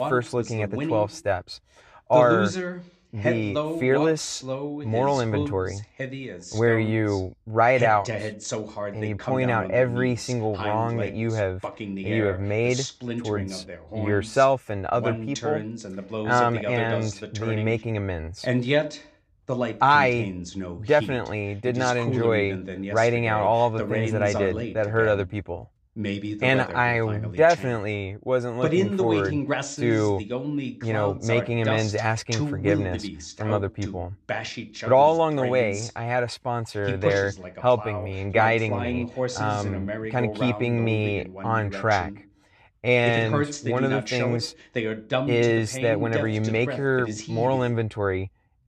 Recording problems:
voice in the background; loud; throughout; 7 dB below the speech

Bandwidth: 14.5 kHz